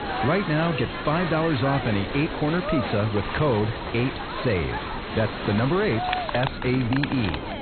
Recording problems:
garbled, watery; badly; nothing above 4 kHz
crowd noise; loud; throughout; 6 dB below the speech
wind in the background; noticeable; throughout; 10 dB below the speech
wind noise on the microphone; occasional gusts; 15 dB below the speech

